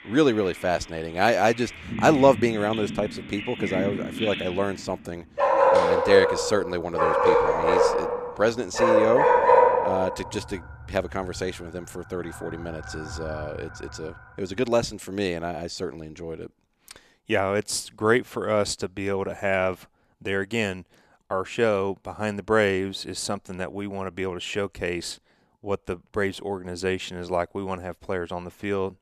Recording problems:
animal sounds; very loud; until 14 s; 4 dB above the speech

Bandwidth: 14 kHz